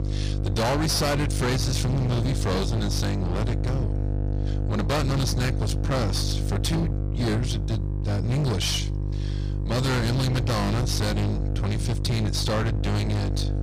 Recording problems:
distortion; heavy; 38% of the sound clipped
electrical hum; loud; throughout; 50 Hz, 7 dB below the speech

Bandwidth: 15 kHz